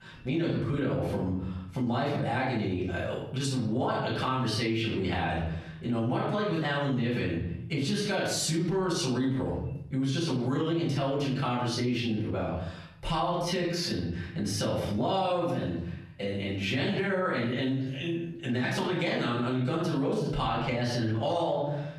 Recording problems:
off-mic speech; far
squashed, flat; heavily
room echo; noticeable; dies away in 0.6 s

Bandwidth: 15.5 kHz